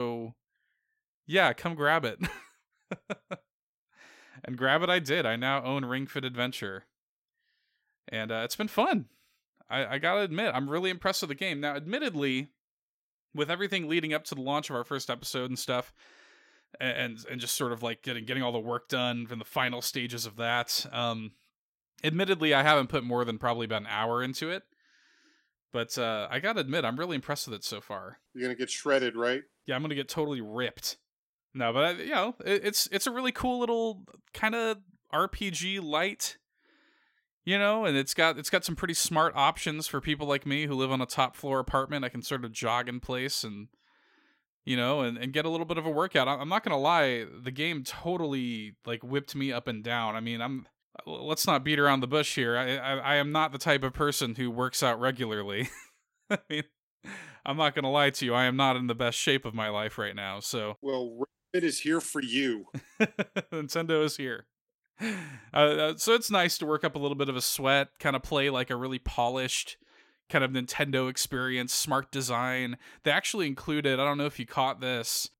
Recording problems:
abrupt cut into speech; at the start

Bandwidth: 16 kHz